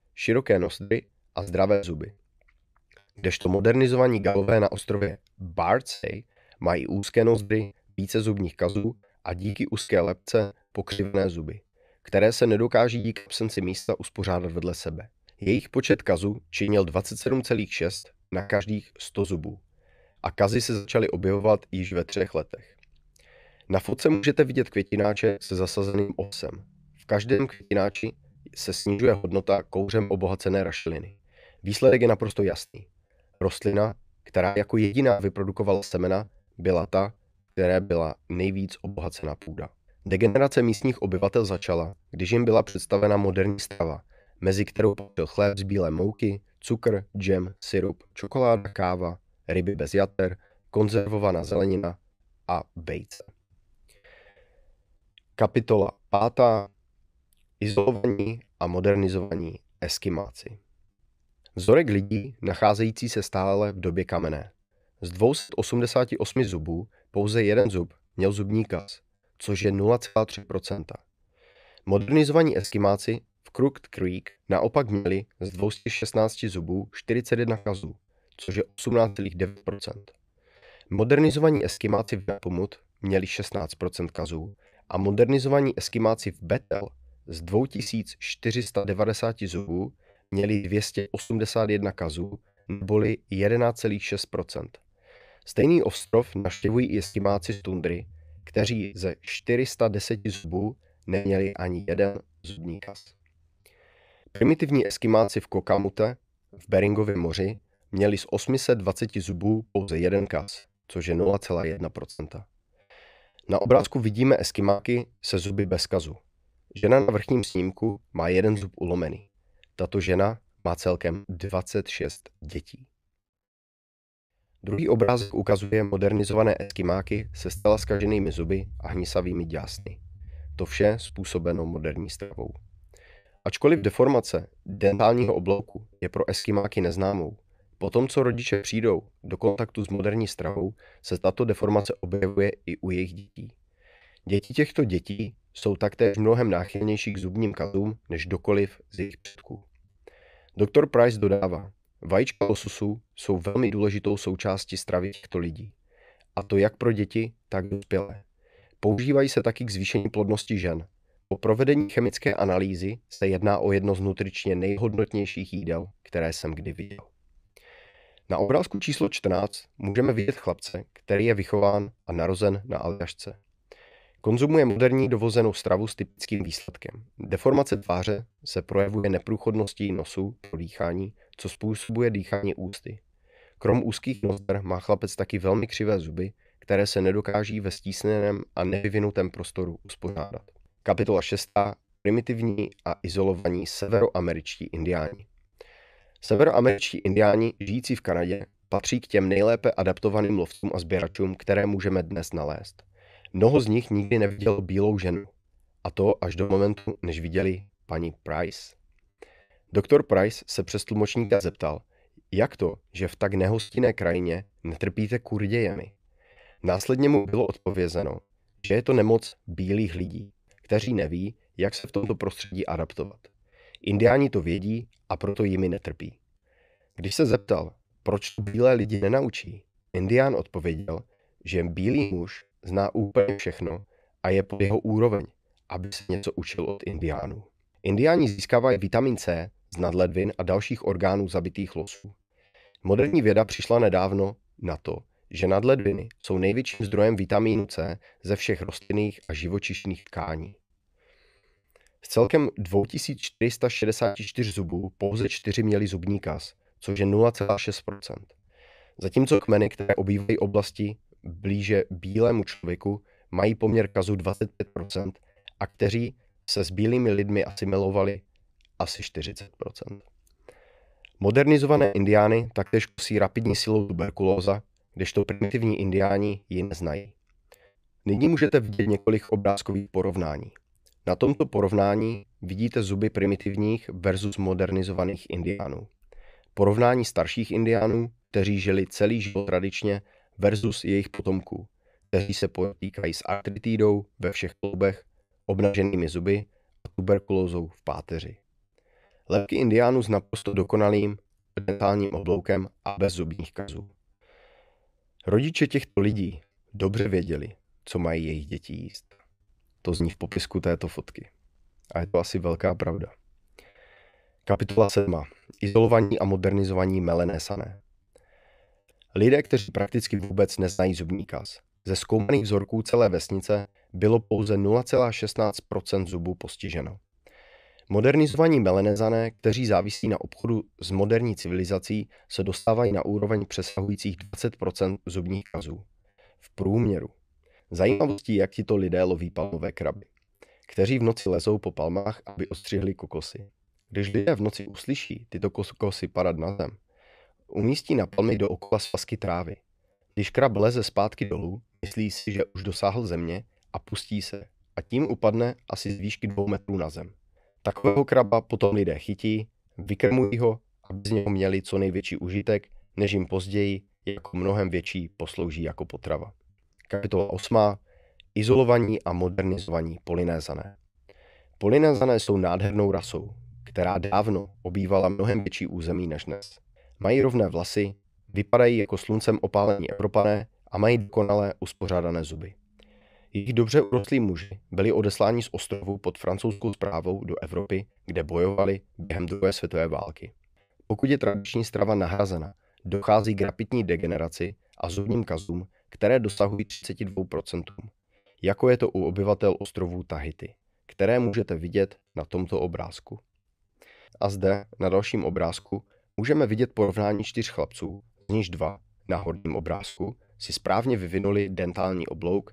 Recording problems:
choppy; very; 14% of the speech affected

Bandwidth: 15 kHz